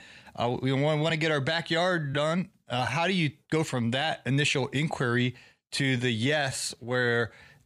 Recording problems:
uneven, jittery; strongly; from 1 to 7 s

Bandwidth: 15 kHz